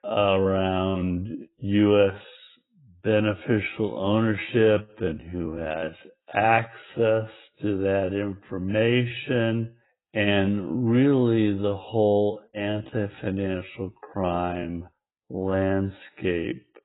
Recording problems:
garbled, watery; badly; nothing above 3.5 kHz
wrong speed, natural pitch; too slow; 0.5 times normal speed

